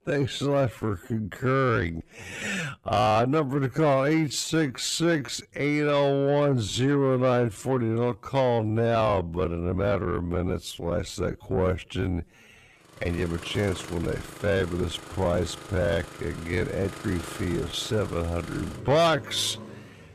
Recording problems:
wrong speed, natural pitch; too slow; 0.5 times normal speed
distortion; slight; 10 dB below the speech
traffic noise; noticeable; from 13 s on; 15 dB below the speech

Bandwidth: 14.5 kHz